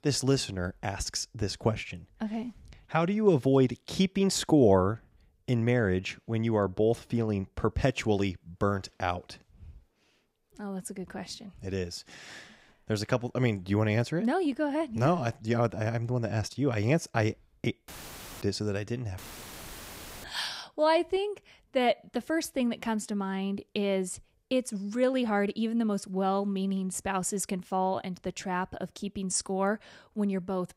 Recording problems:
audio cutting out; filled with static; at 18 s for 0.5 s and at 19 s for 1 s

